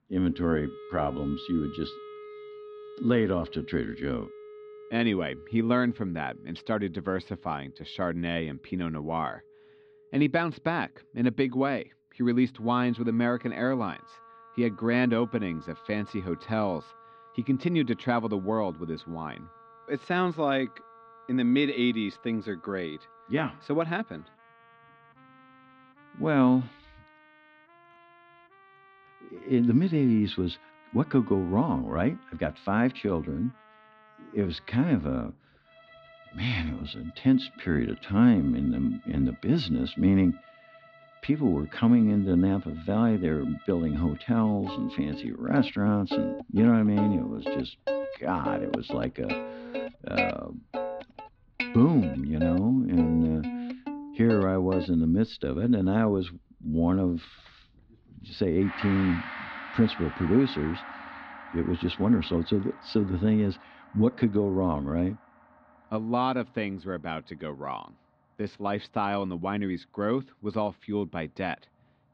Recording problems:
muffled; slightly; fading above 4 kHz
background music; noticeable; throughout; 10 dB below the speech

